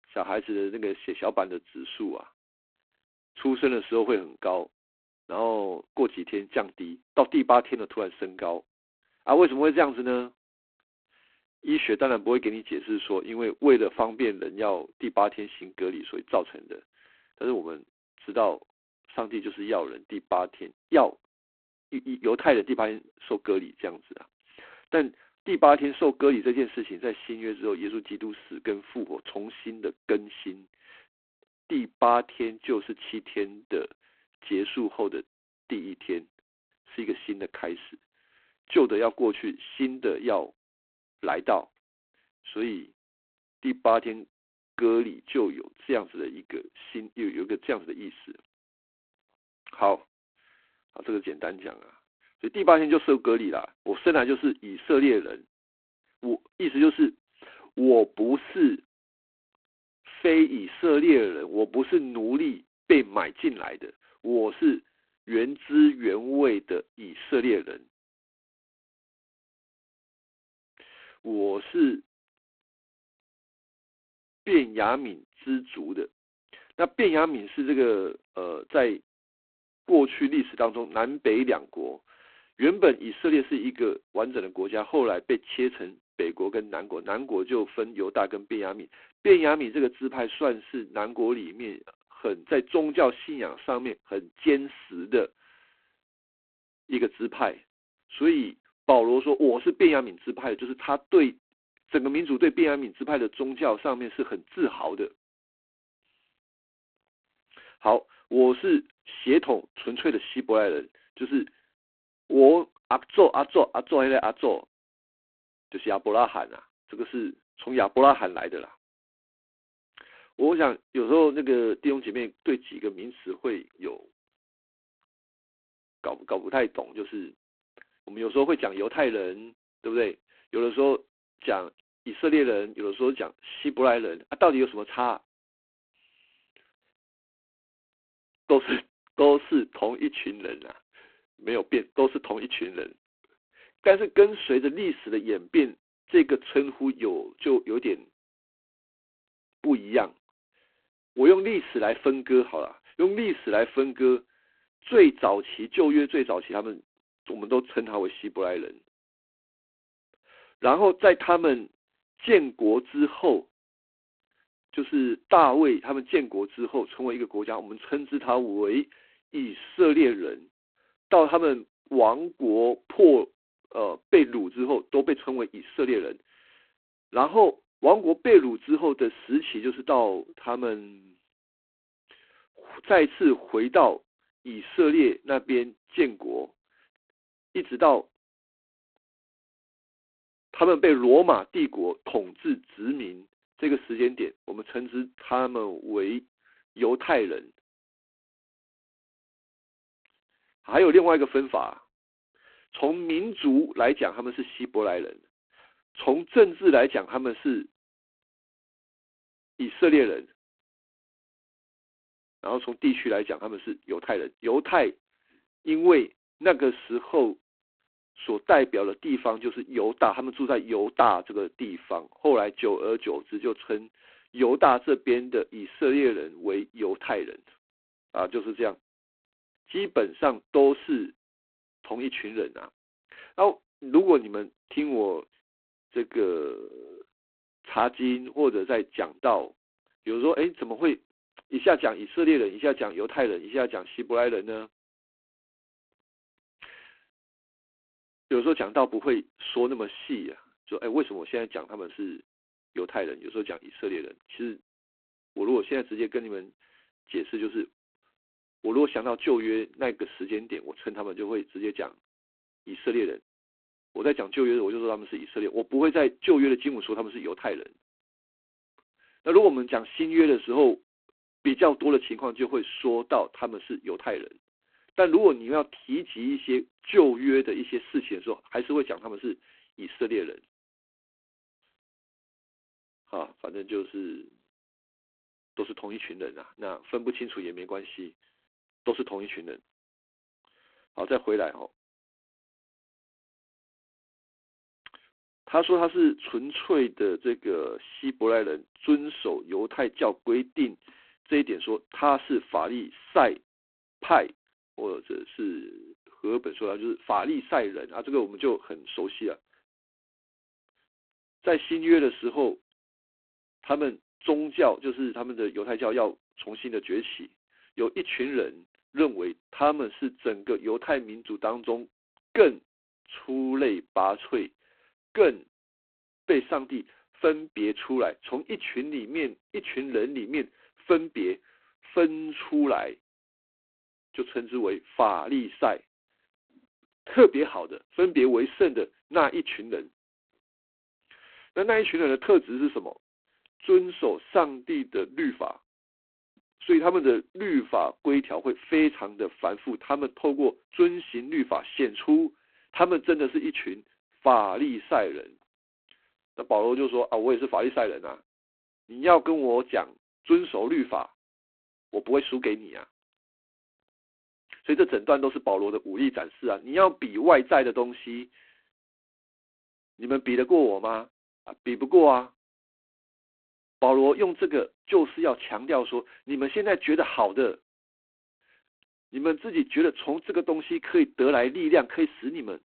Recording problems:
phone-call audio; poor line

